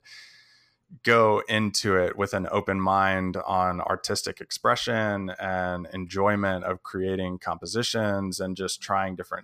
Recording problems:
none

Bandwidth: 15 kHz